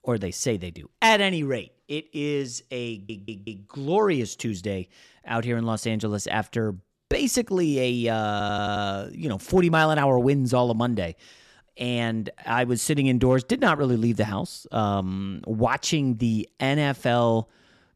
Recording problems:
audio stuttering; at 3 s and at 8.5 s

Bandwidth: 13.5 kHz